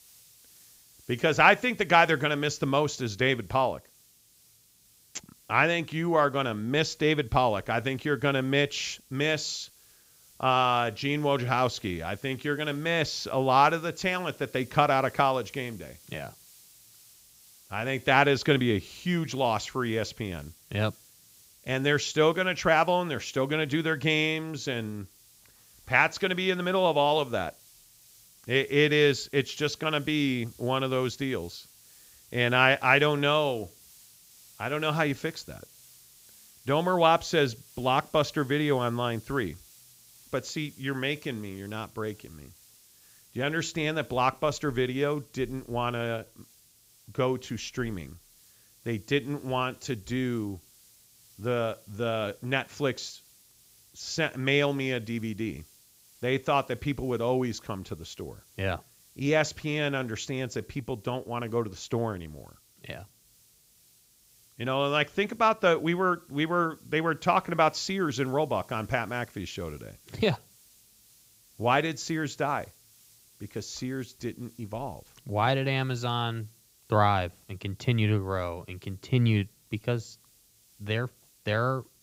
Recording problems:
high frequencies cut off; noticeable; nothing above 8 kHz
hiss; faint; throughout; 25 dB below the speech

